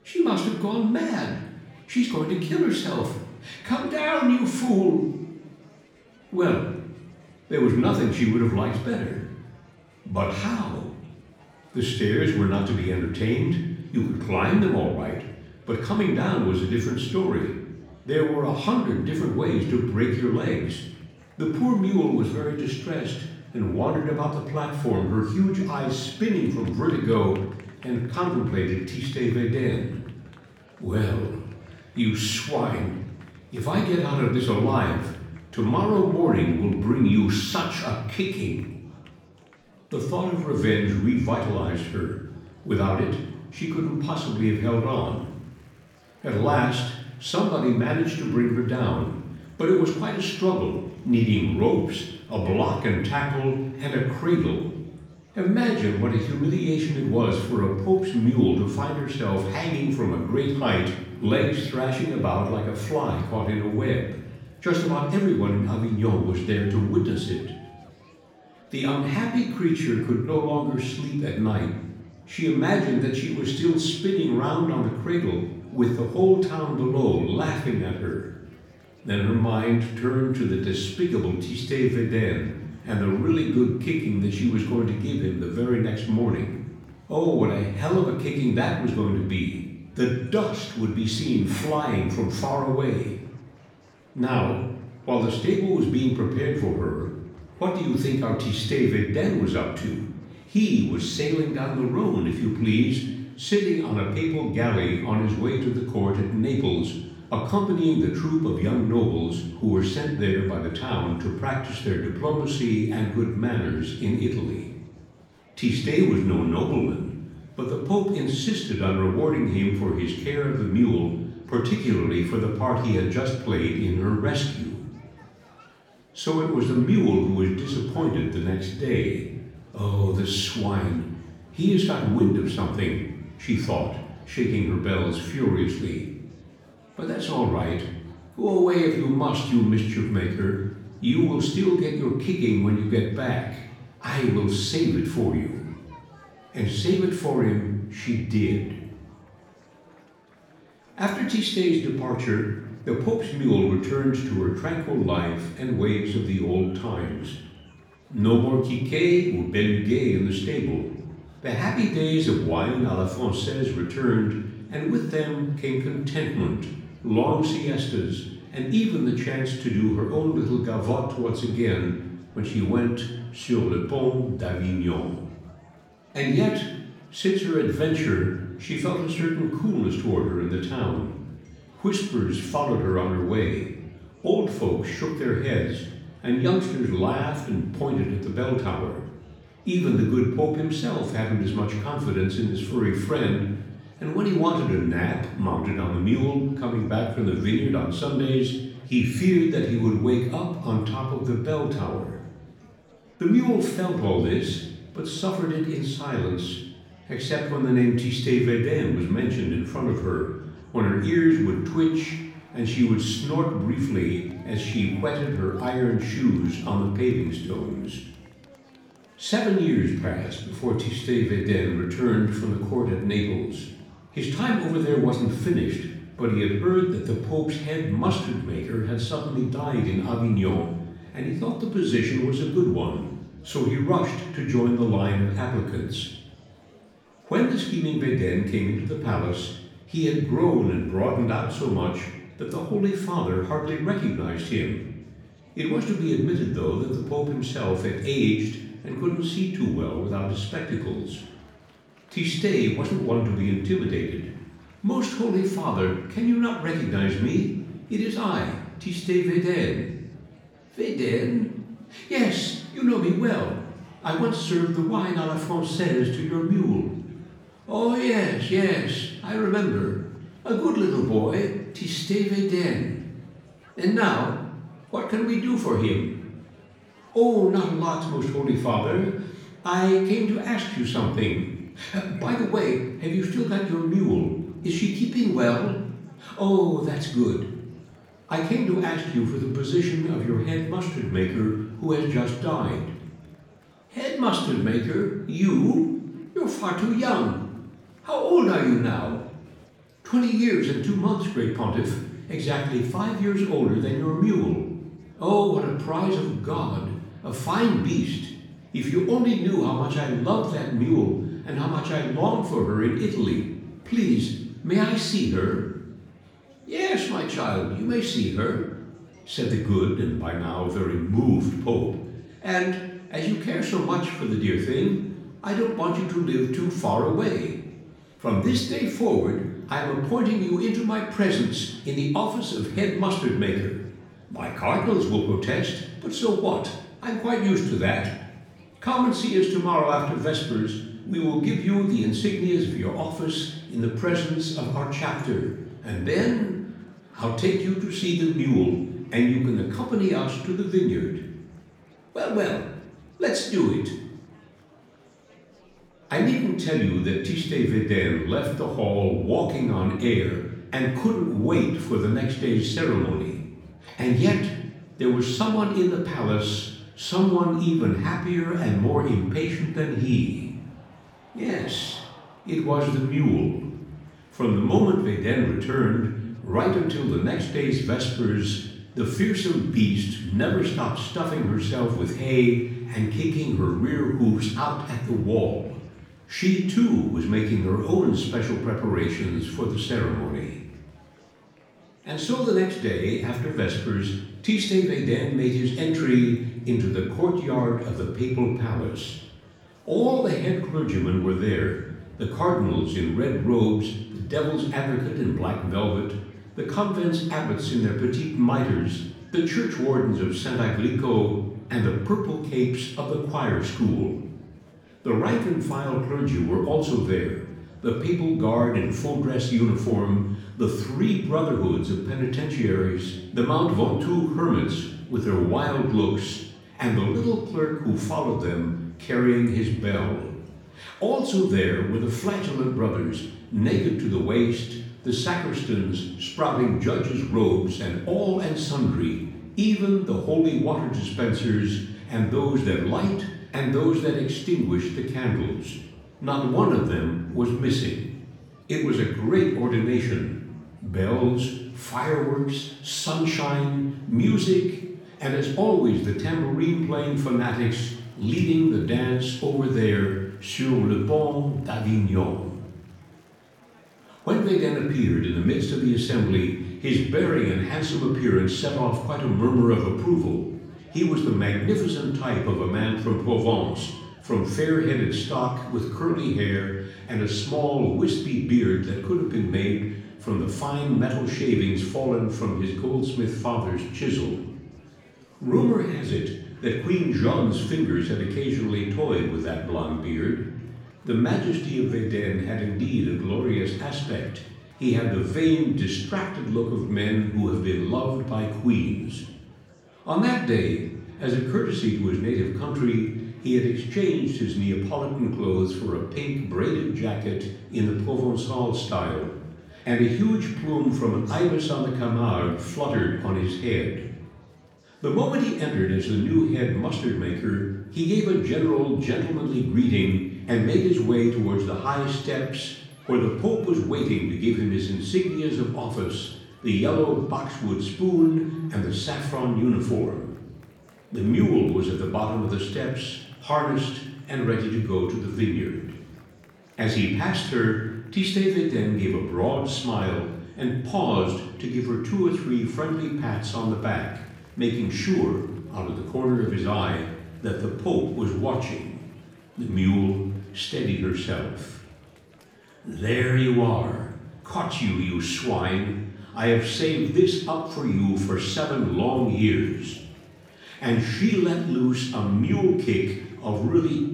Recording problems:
off-mic speech; far
room echo; noticeable; dies away in 0.8 s
murmuring crowd; faint; throughout; 30 dB below the speech

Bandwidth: 17.5 kHz